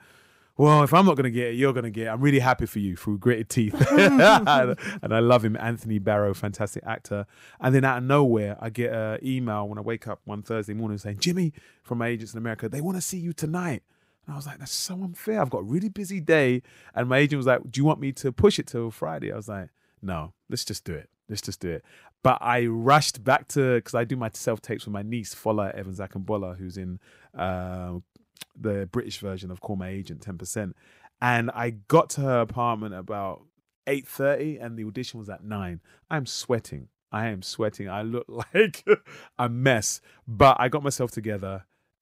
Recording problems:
none

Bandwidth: 15.5 kHz